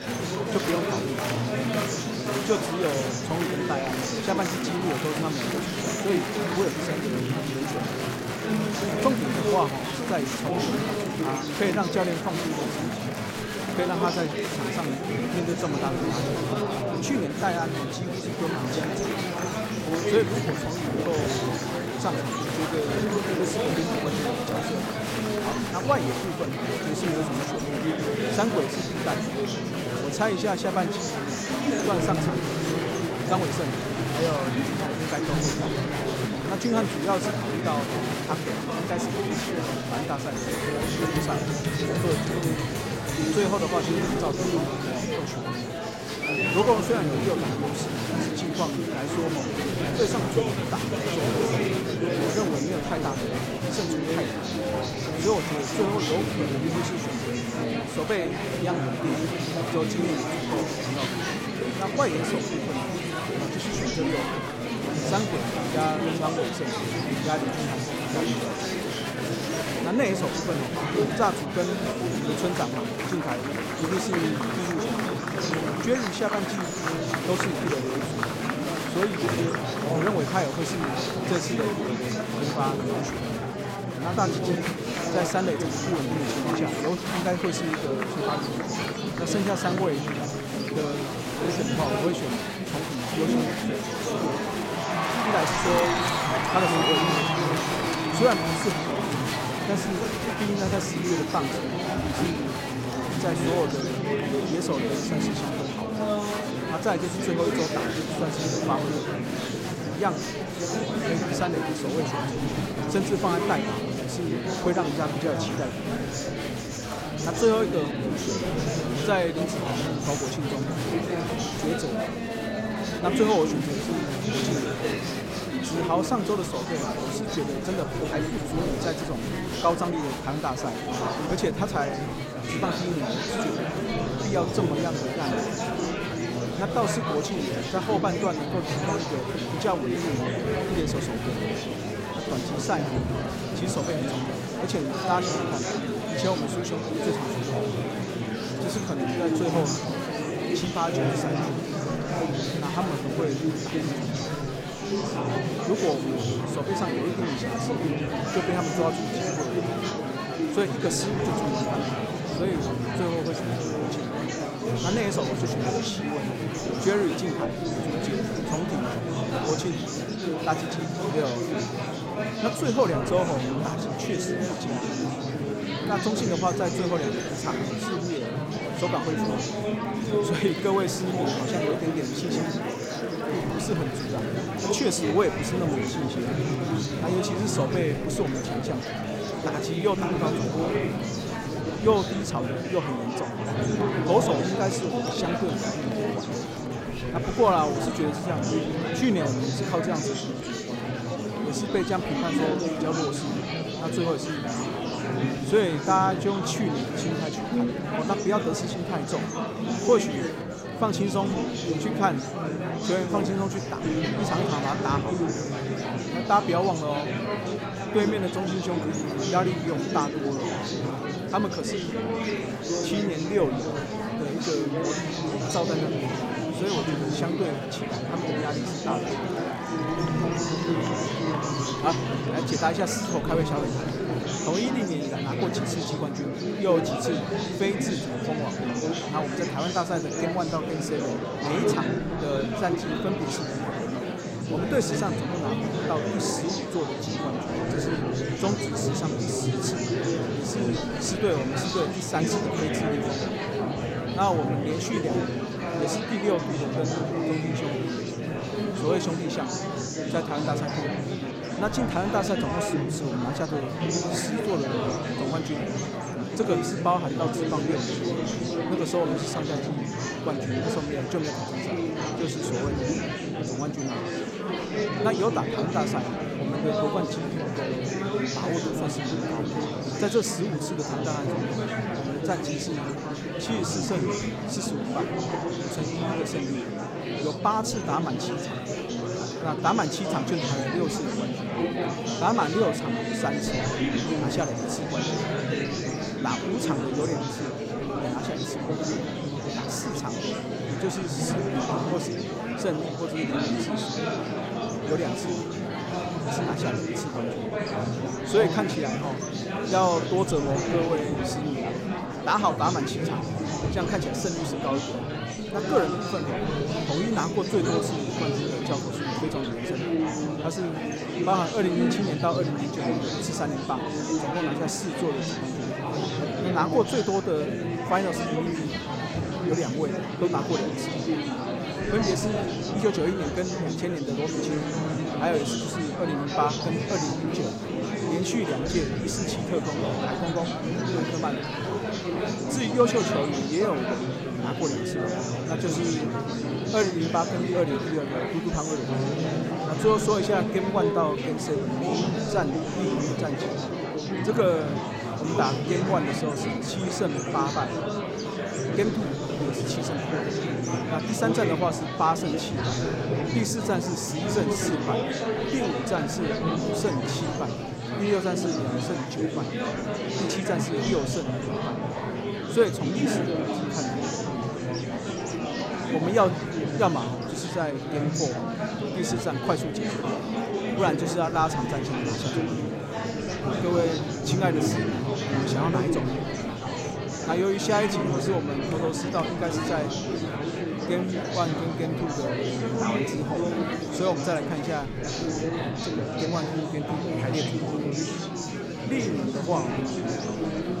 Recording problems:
murmuring crowd; very loud; throughout; 1 dB above the speech

